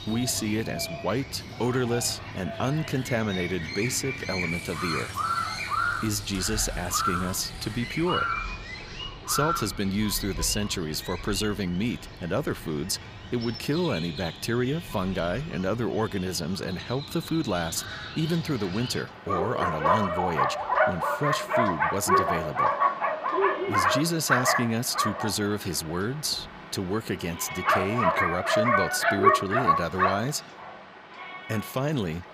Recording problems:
animal sounds; very loud; throughout; 1 dB above the speech
household noises; noticeable; until 8 s; 15 dB below the speech

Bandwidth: 15 kHz